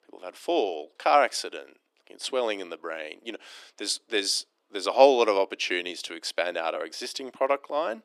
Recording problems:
thin; somewhat; fading below 300 Hz

